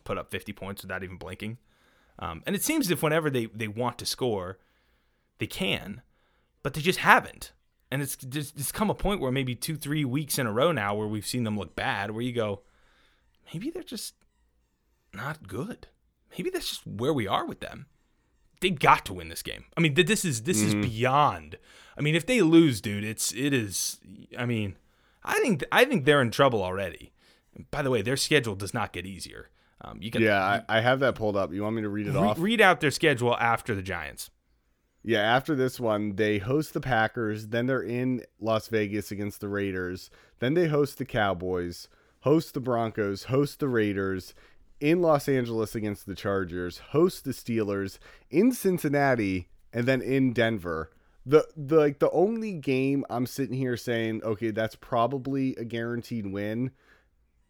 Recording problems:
none

